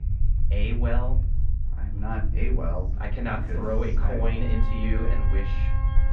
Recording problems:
off-mic speech; far
muffled; very; fading above 2.5 kHz
room echo; slight; dies away in 0.5 s
background music; noticeable; throughout; 10 dB below the speech
low rumble; noticeable; throughout; 15 dB below the speech

